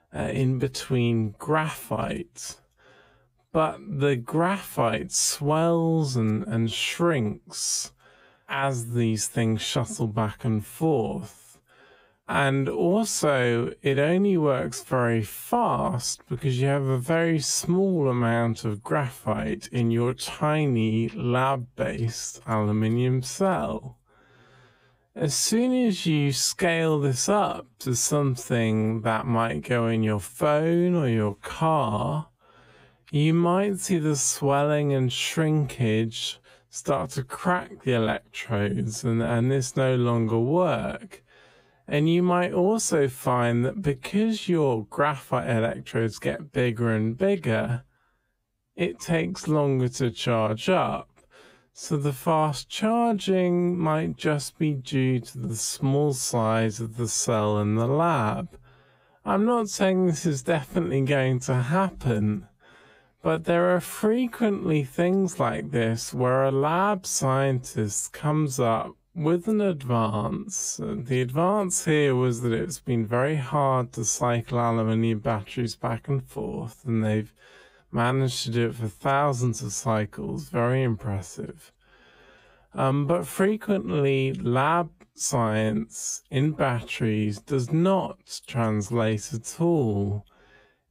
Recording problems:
wrong speed, natural pitch; too slow; 0.6 times normal speed

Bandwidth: 15.5 kHz